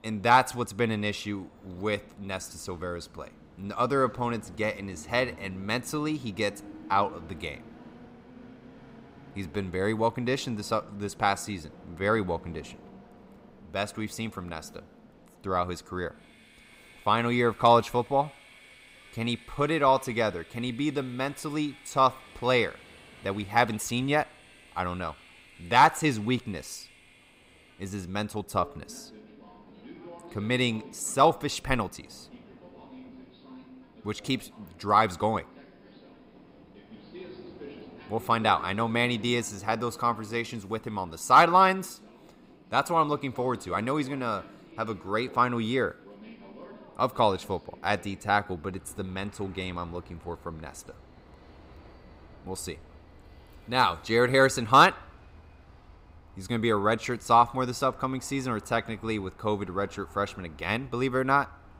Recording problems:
train or aircraft noise; faint; throughout; 25 dB below the speech

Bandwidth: 15.5 kHz